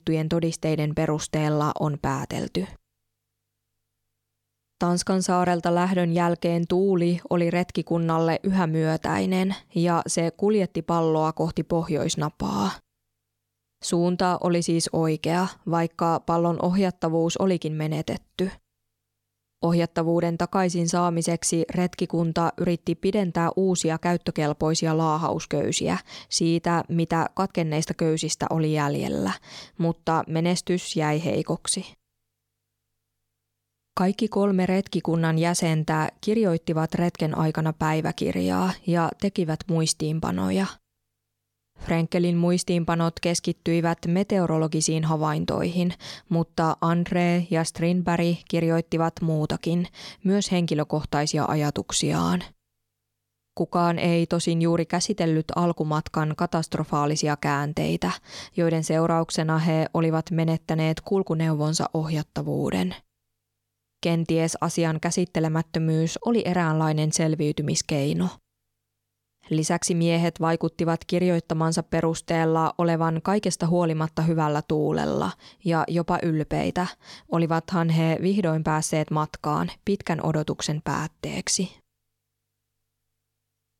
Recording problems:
none

